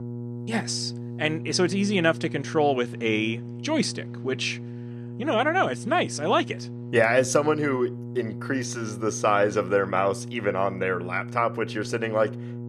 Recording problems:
electrical hum; noticeable; throughout; 60 Hz, 20 dB below the speech

